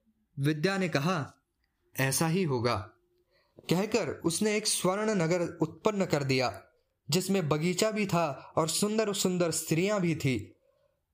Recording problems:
squashed, flat; somewhat

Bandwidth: 15 kHz